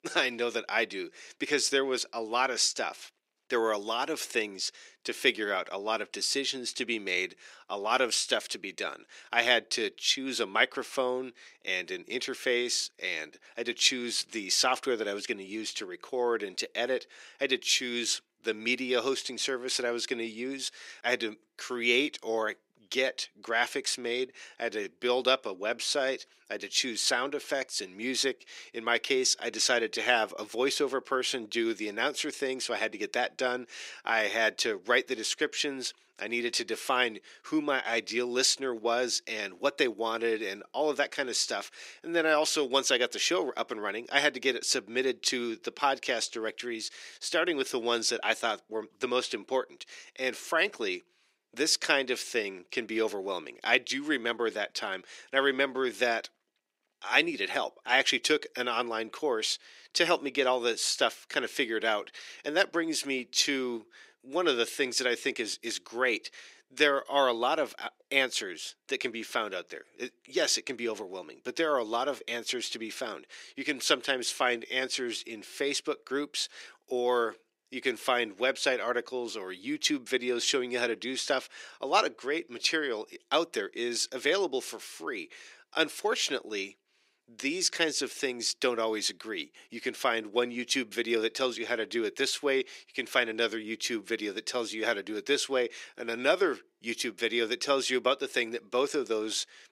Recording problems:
thin; somewhat; fading below 300 Hz

